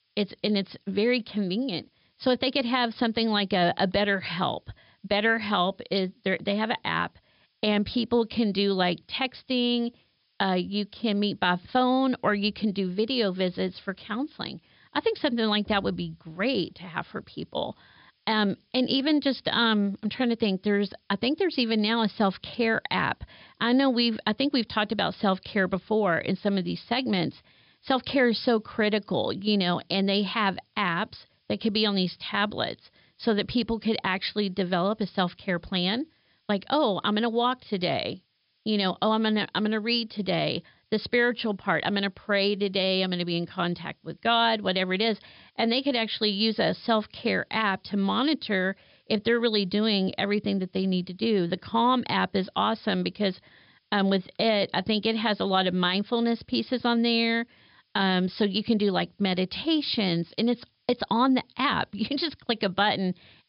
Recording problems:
high frequencies cut off; noticeable; nothing above 5.5 kHz
hiss; very faint; throughout; 45 dB below the speech

